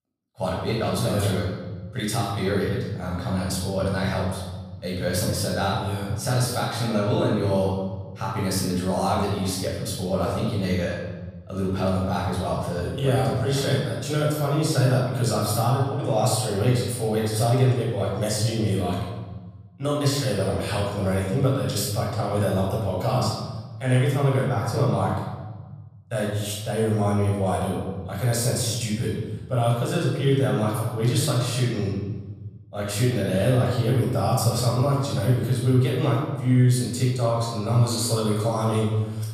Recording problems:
off-mic speech; far
room echo; noticeable; dies away in 1.2 s

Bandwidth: 15 kHz